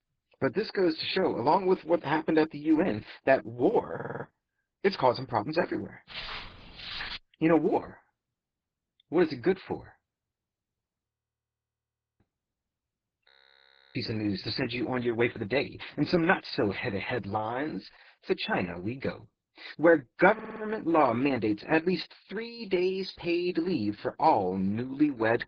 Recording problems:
garbled, watery; badly
audio stuttering; at 4 s and at 20 s
footsteps; noticeable; from 6 to 7 s; peak 8 dB below the speech
audio freezing; at 11 s for 1 s and at 13 s for 0.5 s

